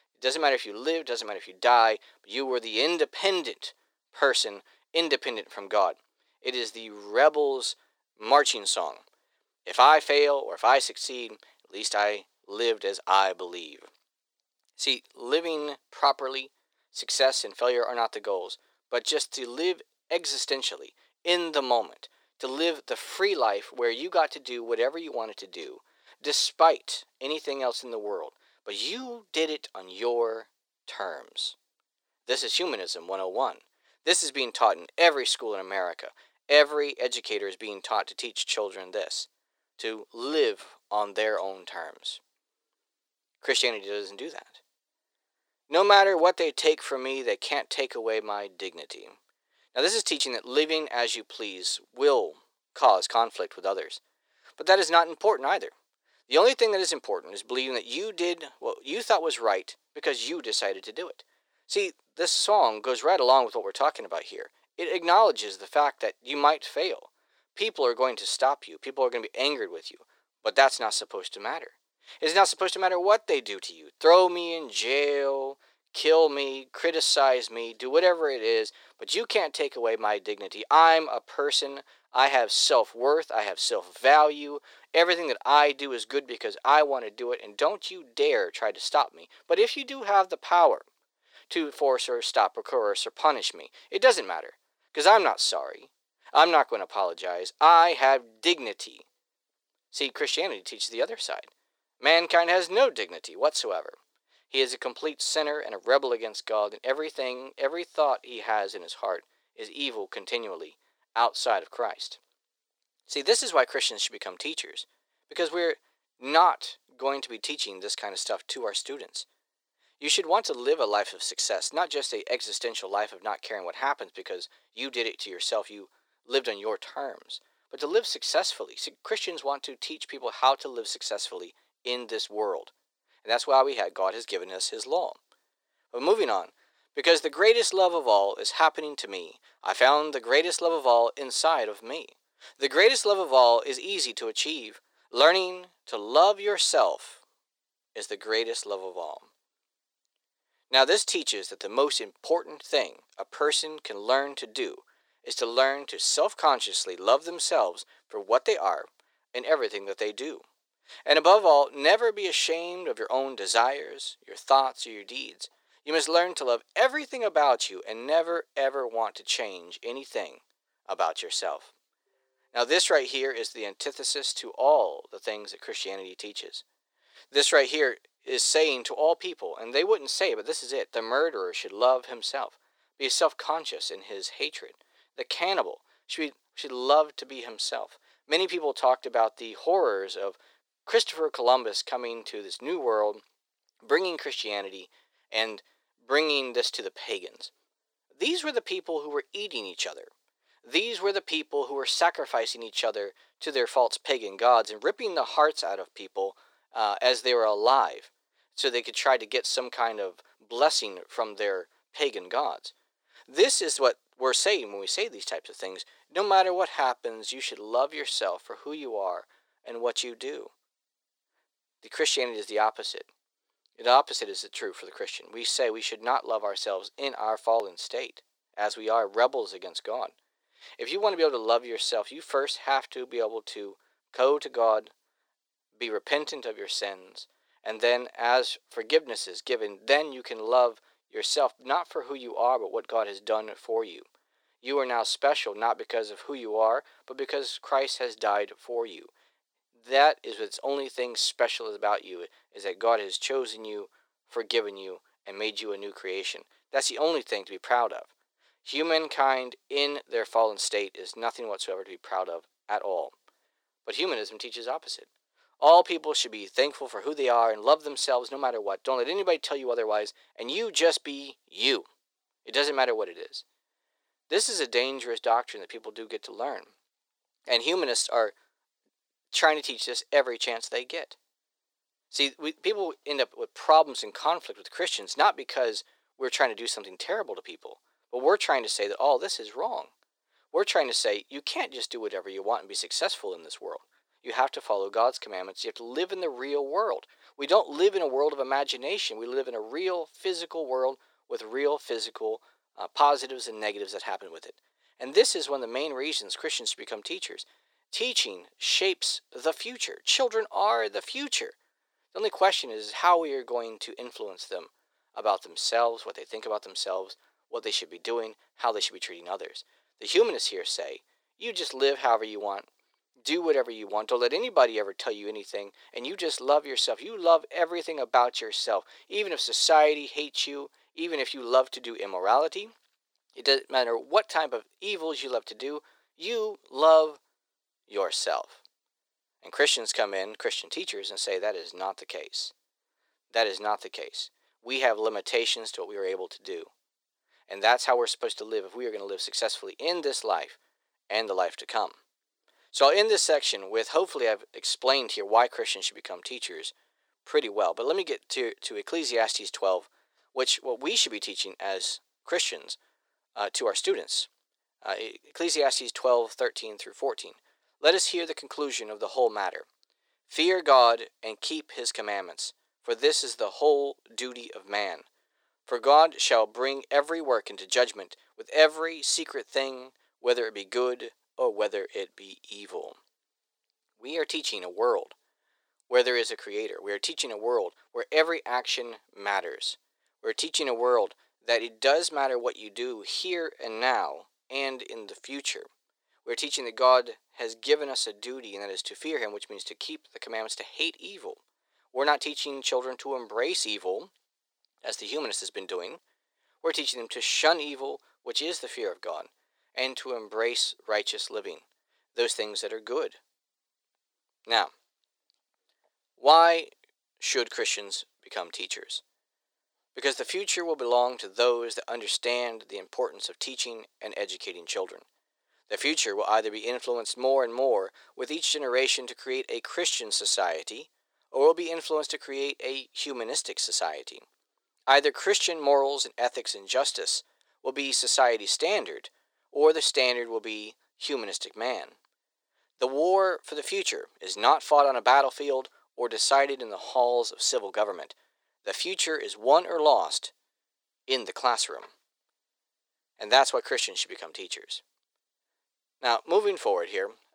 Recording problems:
thin; very; fading below 400 Hz

